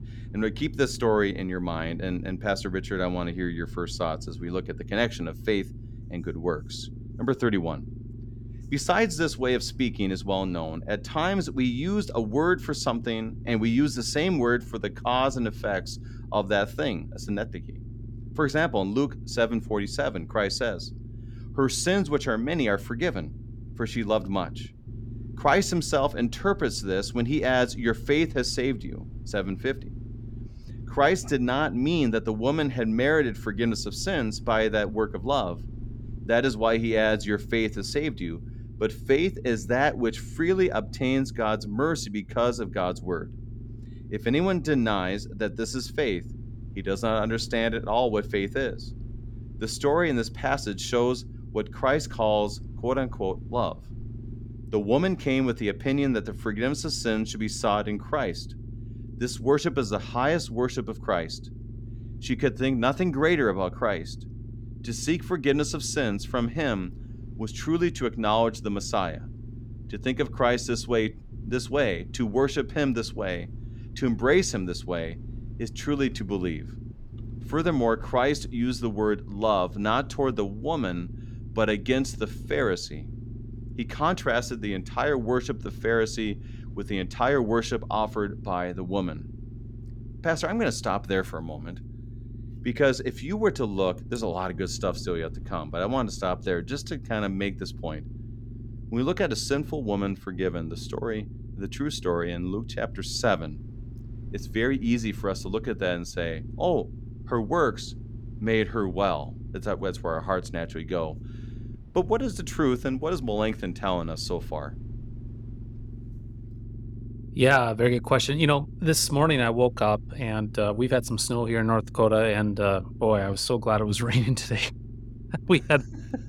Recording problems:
low rumble; faint; throughout; 25 dB below the speech

